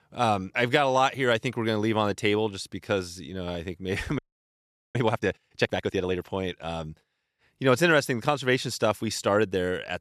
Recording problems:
audio freezing; at 4 s for 1 s

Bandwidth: 13.5 kHz